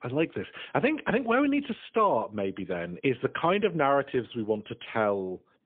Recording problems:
phone-call audio; poor line

